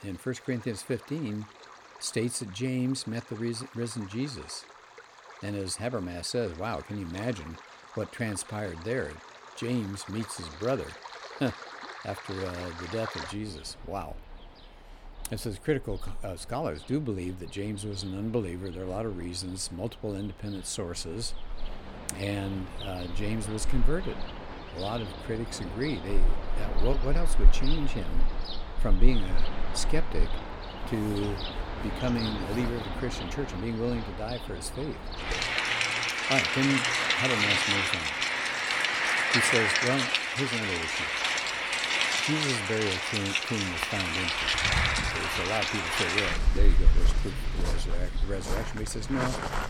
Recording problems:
rain or running water; very loud; throughout; 5 dB above the speech

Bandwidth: 17 kHz